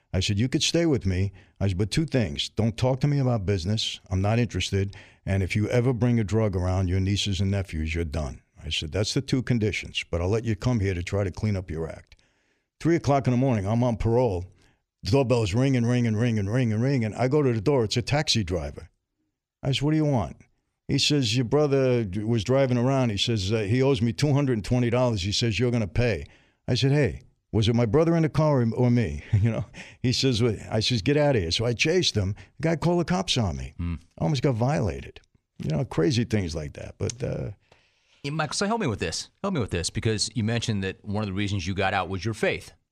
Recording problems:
none

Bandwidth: 14.5 kHz